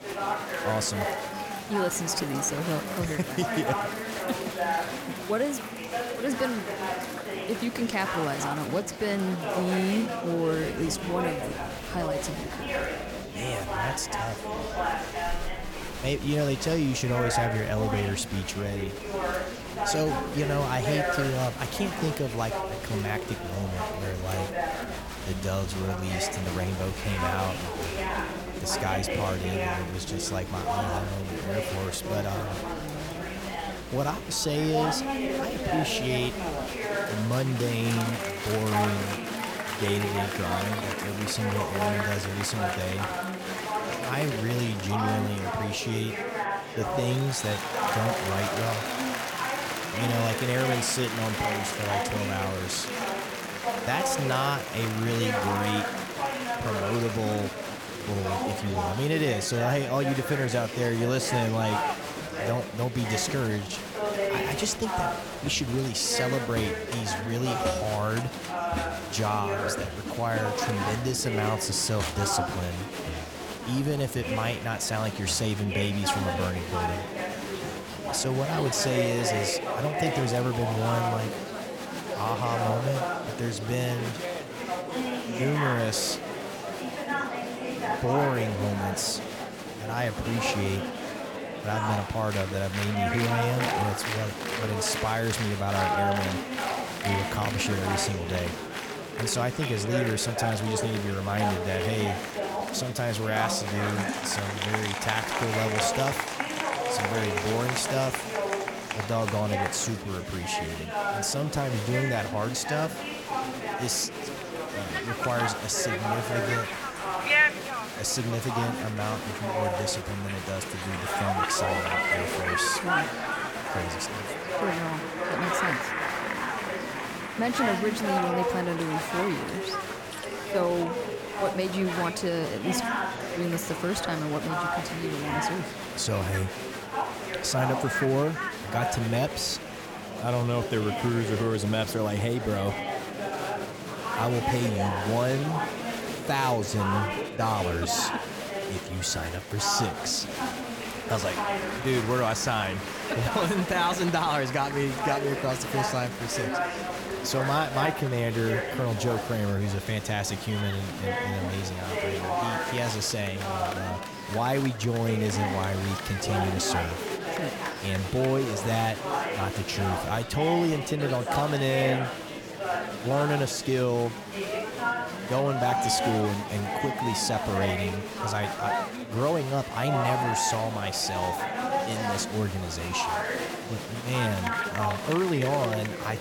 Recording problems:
murmuring crowd; loud; throughout; 2 dB below the speech

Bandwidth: 17.5 kHz